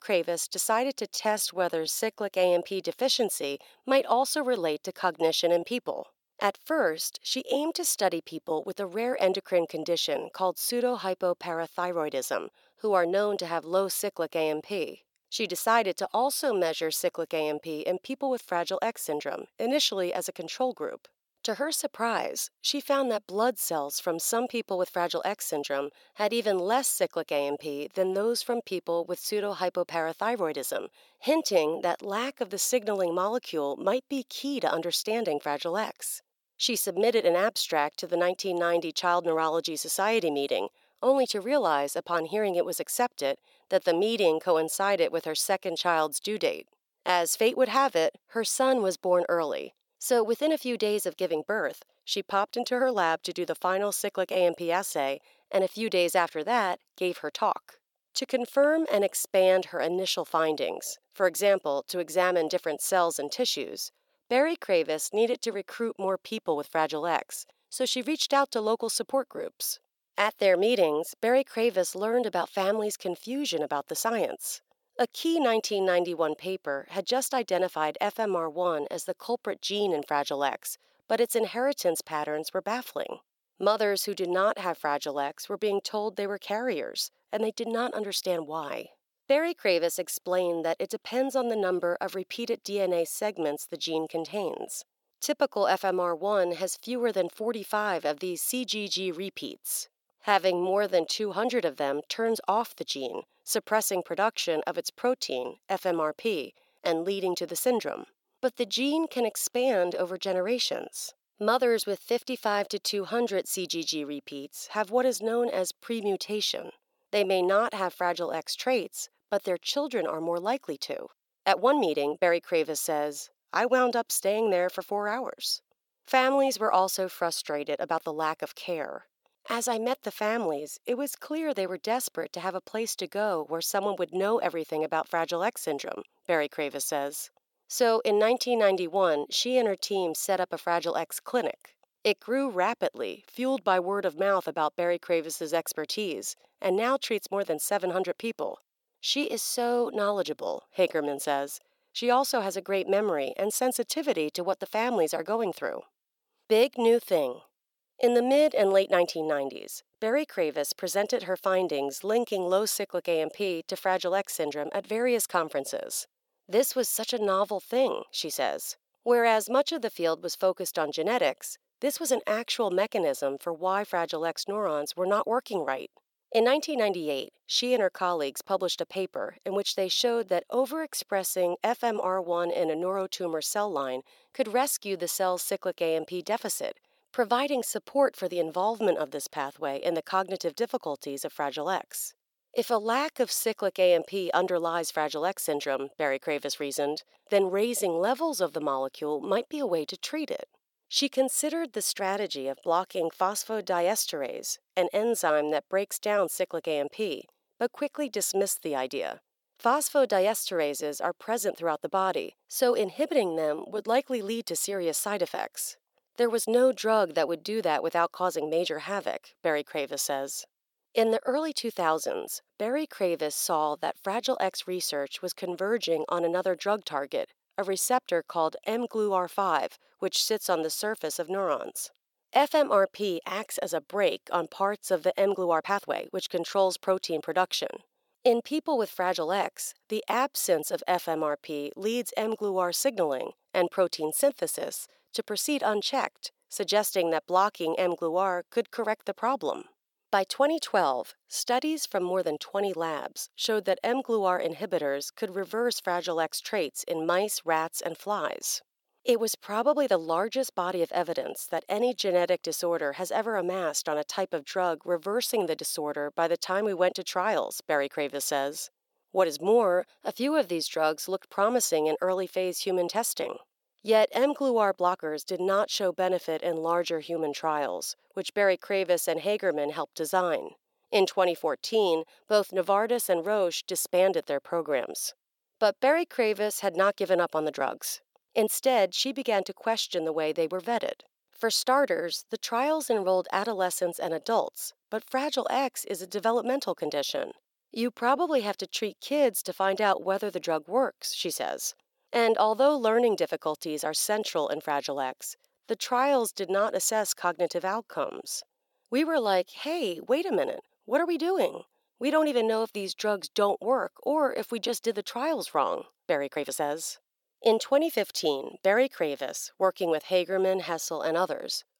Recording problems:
thin; very slightly; fading below 350 Hz
uneven, jittery; strongly; from 1 s to 5:17

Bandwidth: 17.5 kHz